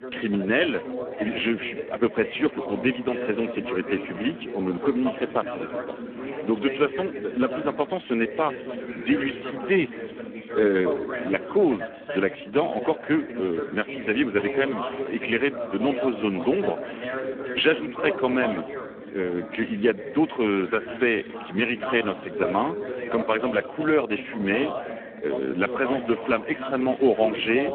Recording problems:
phone-call audio; poor line
background chatter; loud; throughout; 2 voices, 7 dB below the speech

